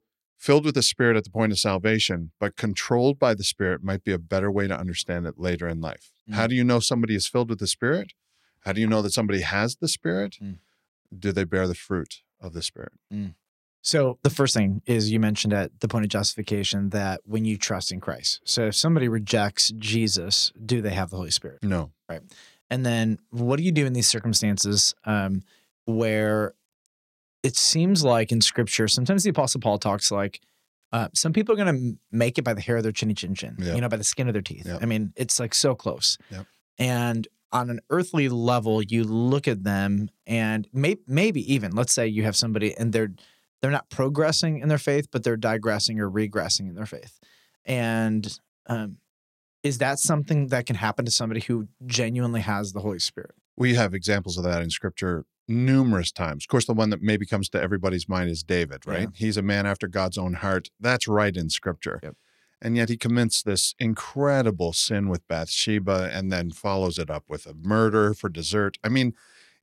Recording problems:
none

